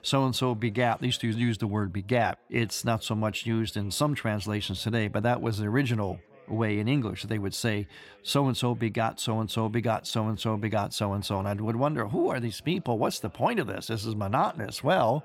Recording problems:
background chatter; faint; throughout; 3 voices, 30 dB below the speech

